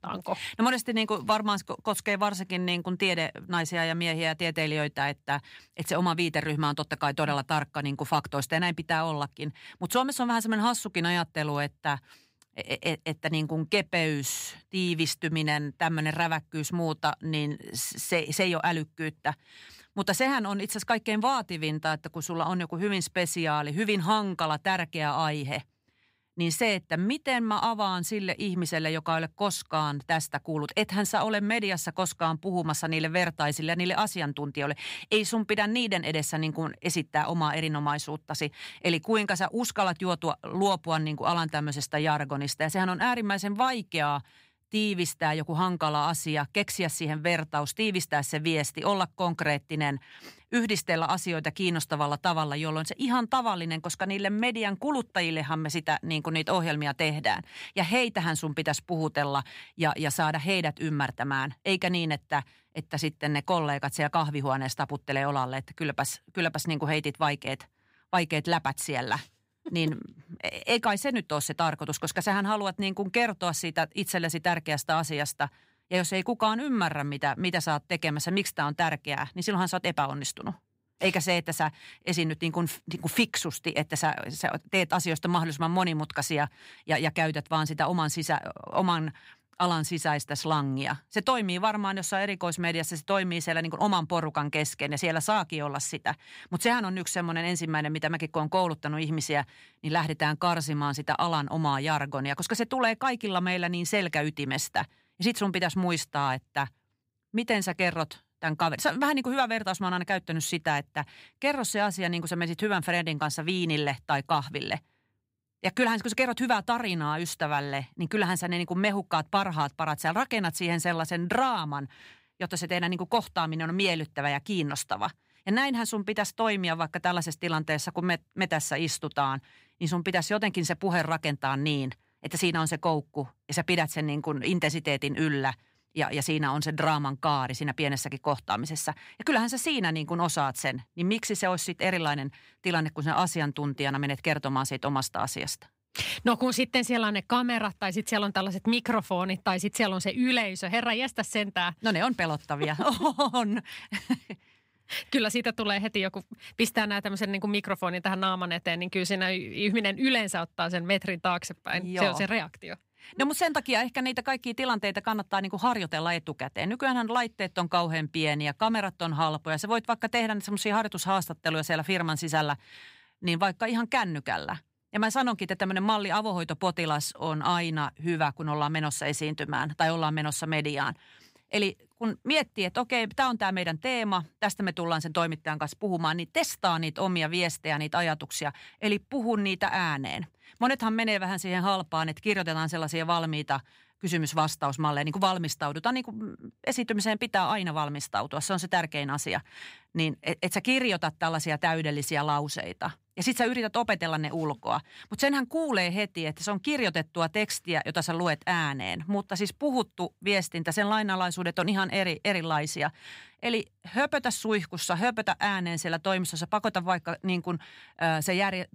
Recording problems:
none

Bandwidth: 15.5 kHz